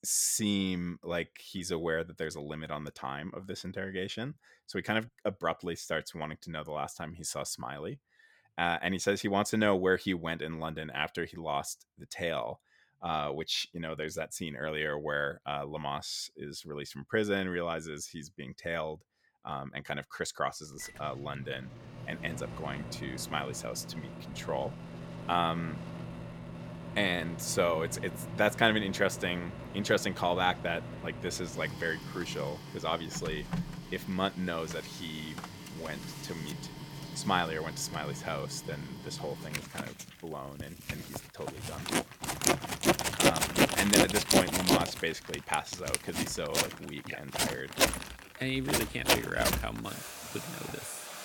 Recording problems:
household noises; very loud; from 21 s on; as loud as the speech

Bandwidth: 17.5 kHz